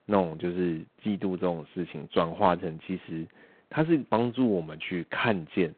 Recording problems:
phone-call audio; poor line

